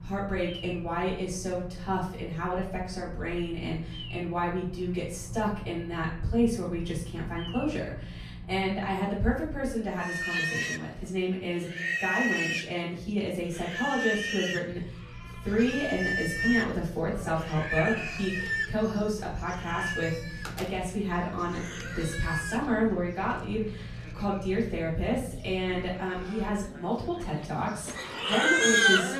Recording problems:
off-mic speech; far
room echo; noticeable; dies away in 0.5 s
animal sounds; very loud; throughout; 2 dB above the speech
low rumble; faint; until 9 s and from 15 to 26 s; 25 dB below the speech
door banging; noticeable; from 18 to 22 s; peak 8 dB below the speech

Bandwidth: 14.5 kHz